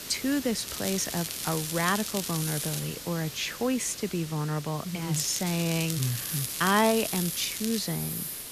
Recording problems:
hiss; loud; throughout; 7 dB below the speech
crackling; loud; from 0.5 to 3 s and from 5 to 8 s; 6 dB below the speech

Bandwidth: 14.5 kHz